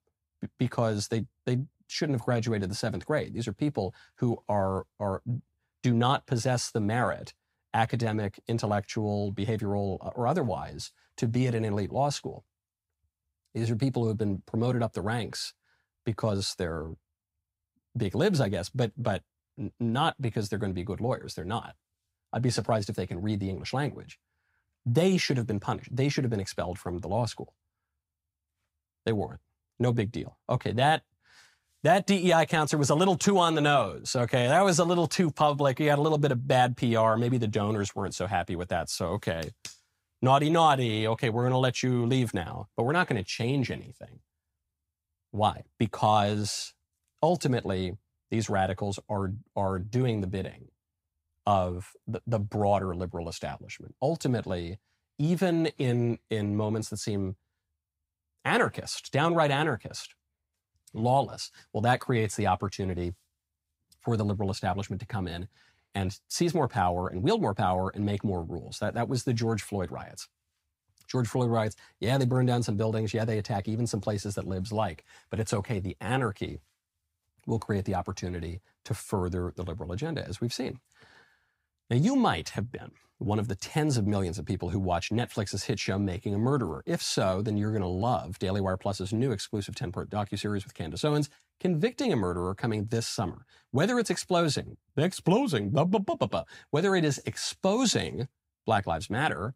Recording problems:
none

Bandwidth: 15.5 kHz